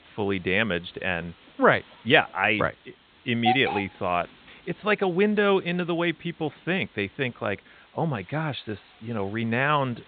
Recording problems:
high frequencies cut off; severe; nothing above 4 kHz
hiss; loud; throughout; 6 dB below the speech

